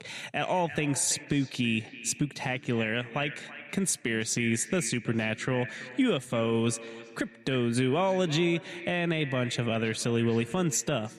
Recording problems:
echo of what is said; noticeable; throughout; 330 ms later, 15 dB below the speech
squashed, flat; somewhat

